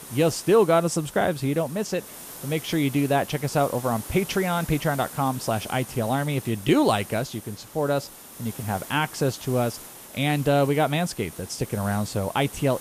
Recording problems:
hiss; noticeable; throughout; 15 dB below the speech

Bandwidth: 14.5 kHz